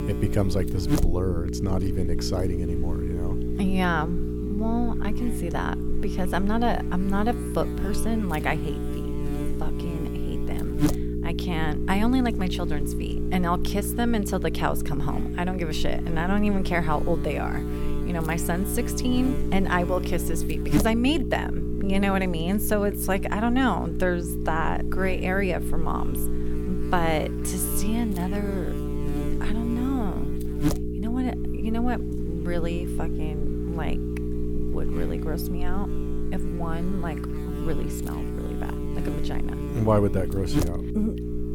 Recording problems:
electrical hum; loud; throughout; 60 Hz, 6 dB below the speech

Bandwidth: 17 kHz